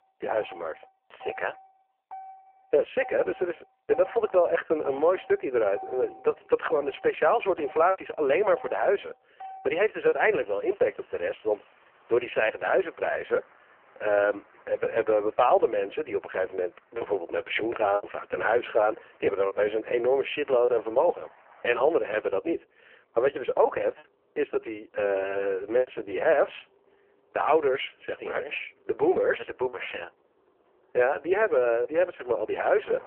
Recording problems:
phone-call audio; poor line
traffic noise; faint; throughout; 25 dB below the speech
choppy; occasionally; 2% of the speech affected

